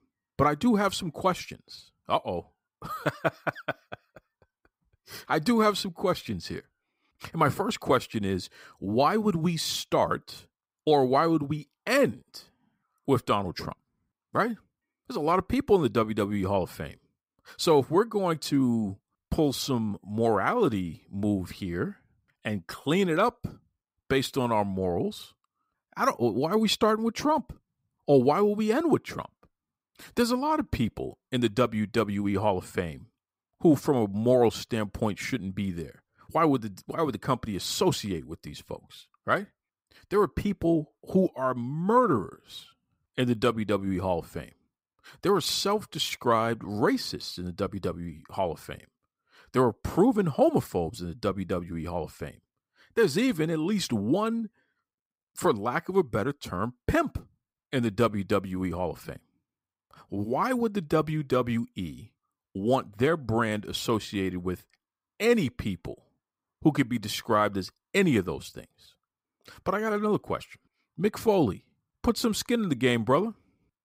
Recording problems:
none

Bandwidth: 15.5 kHz